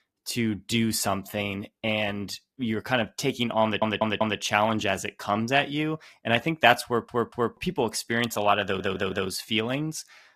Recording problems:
garbled, watery; slightly; nothing above 14.5 kHz
audio stuttering; at 3.5 s, at 7 s and at 8.5 s

